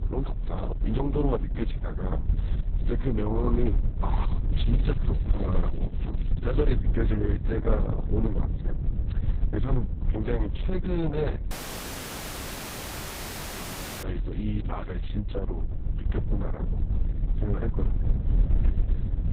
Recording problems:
garbled, watery; badly; nothing above 4 kHz
low rumble; loud; throughout; 9 dB below the speech
crackling; faint; from 4.5 to 6.5 s and from 14 to 15 s; 25 dB below the speech
audio cutting out; at 12 s for 2.5 s

